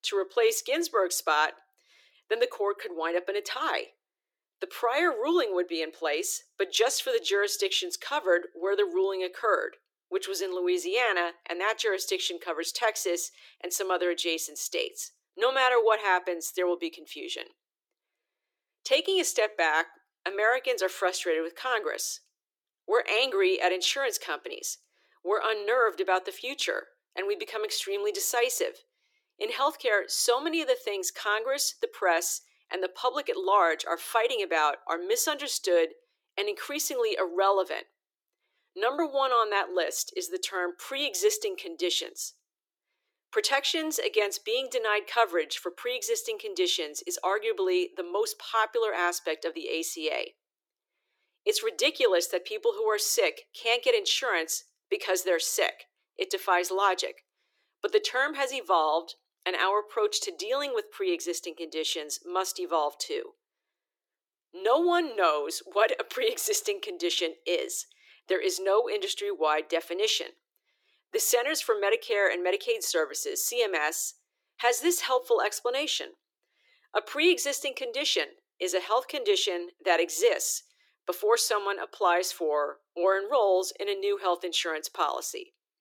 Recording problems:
thin; very; fading below 350 Hz

